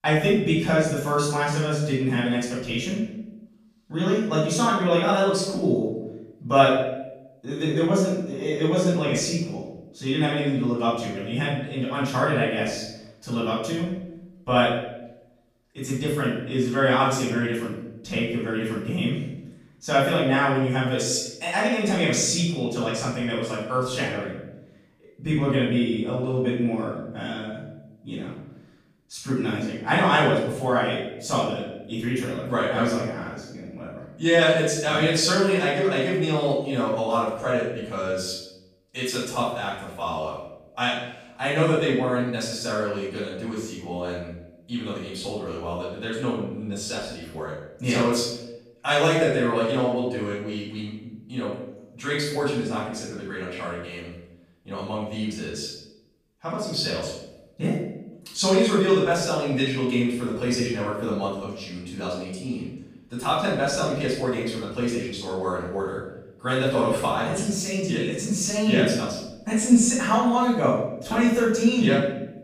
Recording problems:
off-mic speech; far
room echo; noticeable; dies away in 0.7 s

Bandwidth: 15 kHz